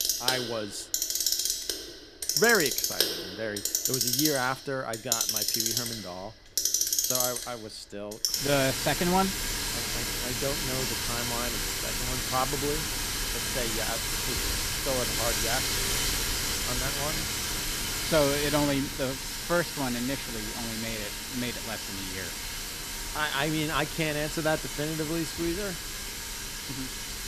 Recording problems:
household noises; very loud; throughout; 3 dB above the speech

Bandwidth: 14.5 kHz